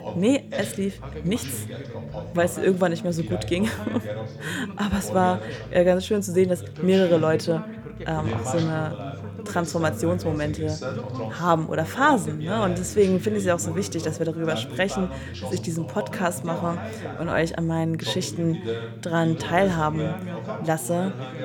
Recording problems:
background chatter; loud; throughout; 2 voices, 9 dB below the speech
low rumble; faint; throughout; 25 dB below the speech

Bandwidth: 18.5 kHz